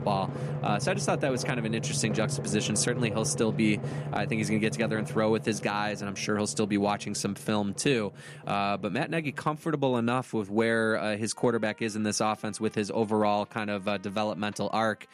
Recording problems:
background music; loud; throughout; 8 dB below the speech

